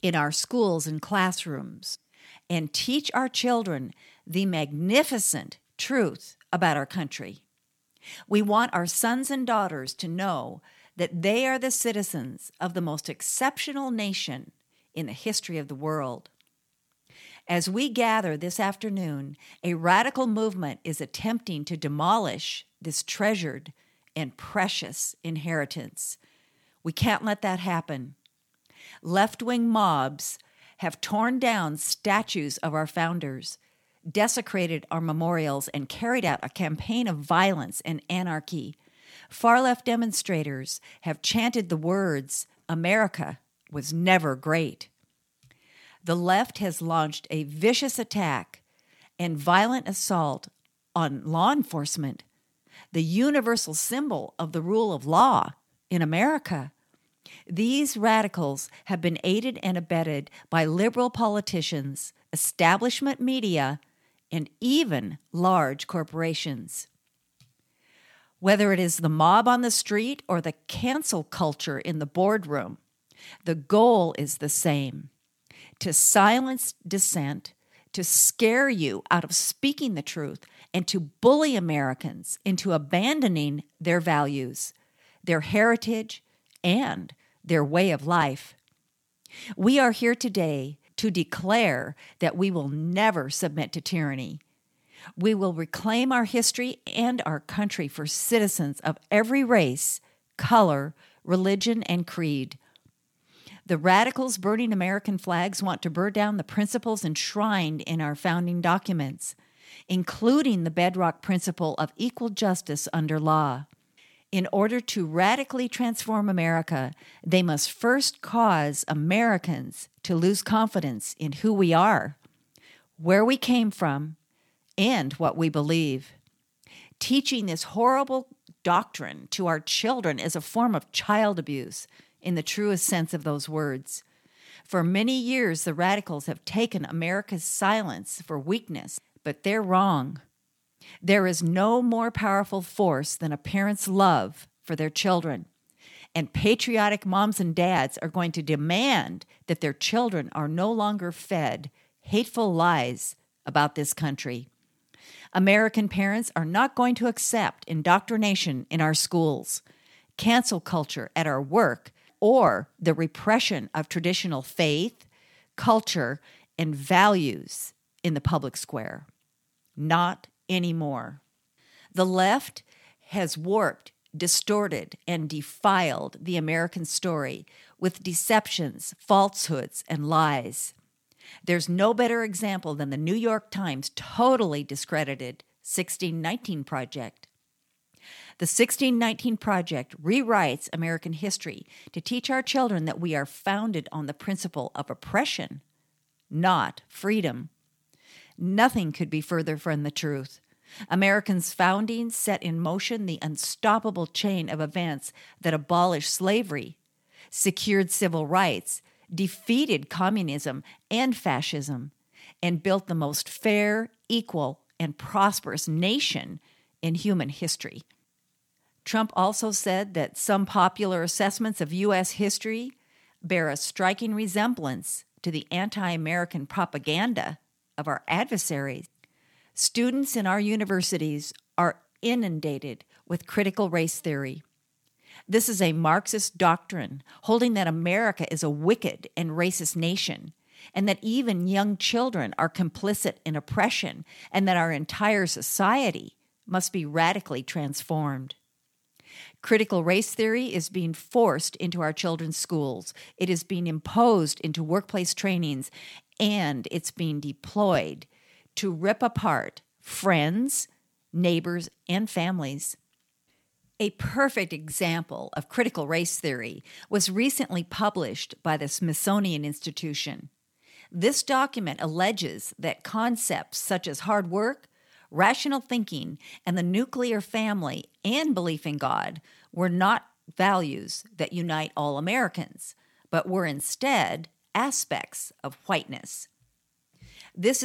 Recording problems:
abrupt cut into speech; at the end

